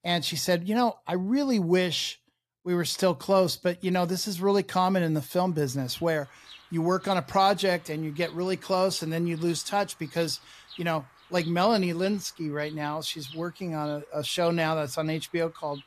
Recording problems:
animal sounds; faint; from 5.5 s on; 20 dB below the speech

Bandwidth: 14 kHz